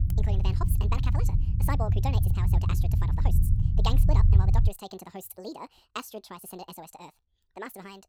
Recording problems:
wrong speed and pitch; too fast and too high; 1.6 times normal speed
low rumble; loud; until 4.5 s; 3 dB below the speech

